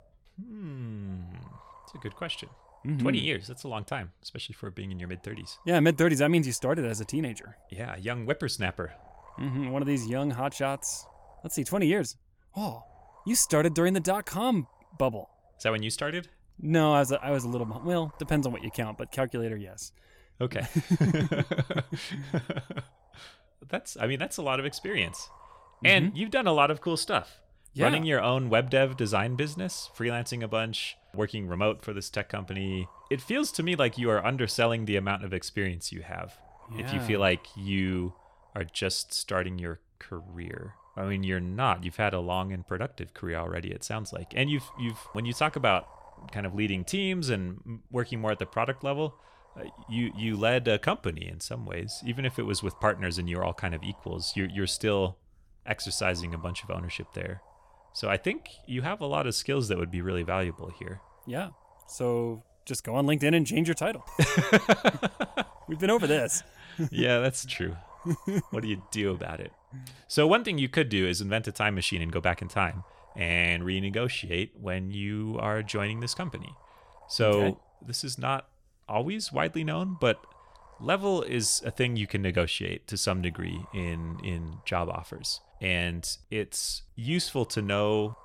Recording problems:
wind noise on the microphone; occasional gusts; 25 dB below the speech

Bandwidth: 17 kHz